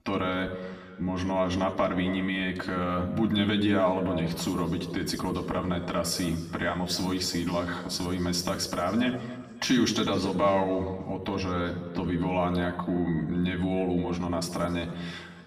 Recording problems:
off-mic speech; far
room echo; slight; dies away in 1.4 s

